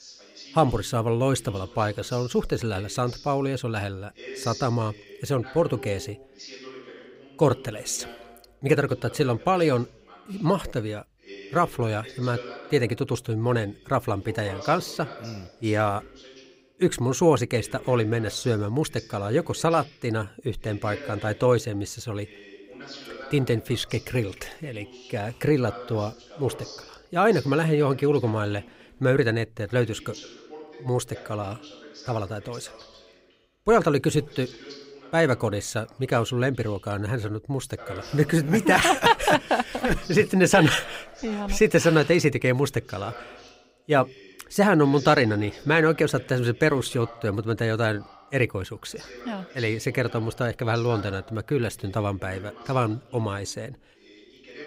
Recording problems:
voice in the background; noticeable; throughout; 20 dB below the speech

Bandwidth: 15.5 kHz